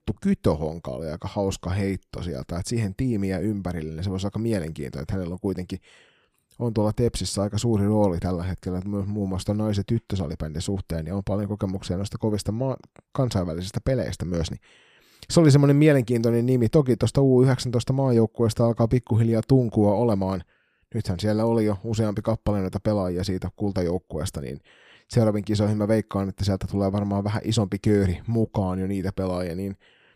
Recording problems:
none

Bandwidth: 15 kHz